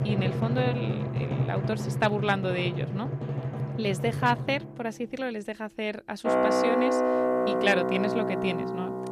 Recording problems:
background music; very loud; throughout; 2 dB above the speech

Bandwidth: 14.5 kHz